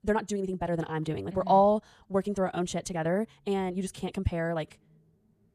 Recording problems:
wrong speed, natural pitch; too fast; 1.6 times normal speed

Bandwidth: 14.5 kHz